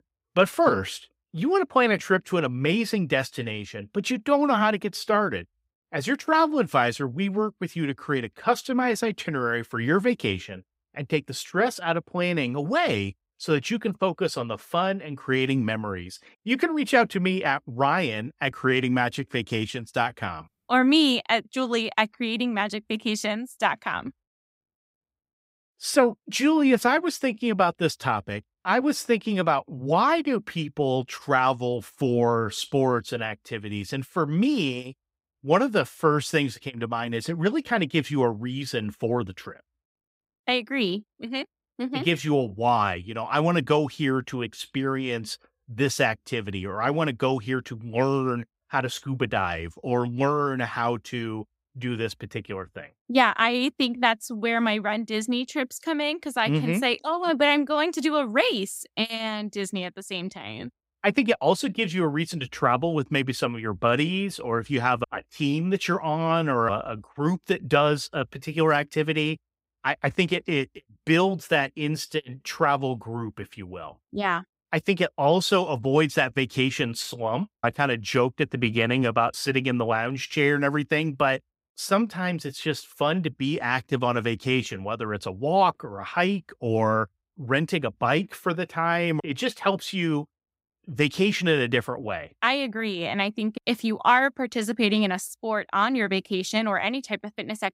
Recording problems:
none

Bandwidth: 15.5 kHz